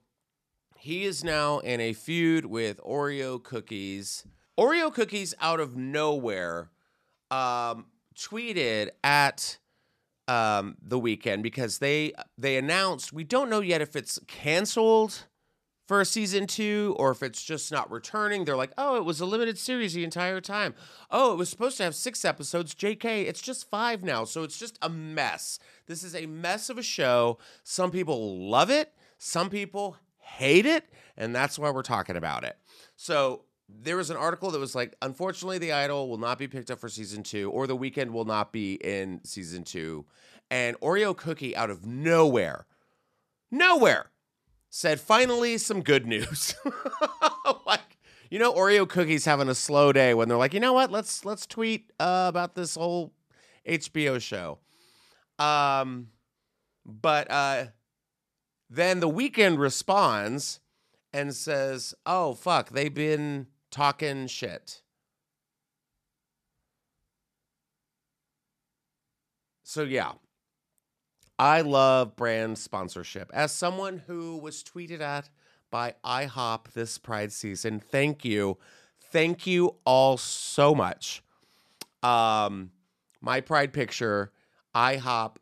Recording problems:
none

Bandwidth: 14 kHz